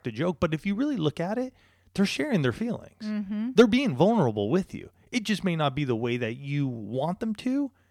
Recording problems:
none

